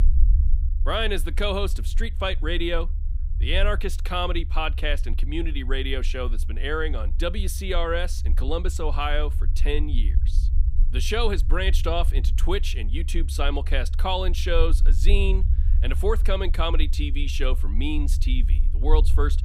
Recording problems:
low rumble; noticeable; throughout; 20 dB below the speech

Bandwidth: 15.5 kHz